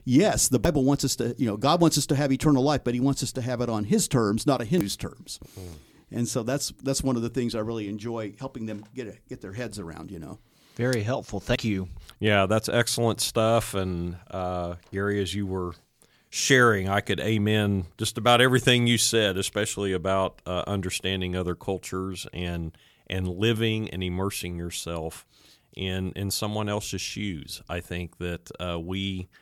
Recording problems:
none

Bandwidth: 18.5 kHz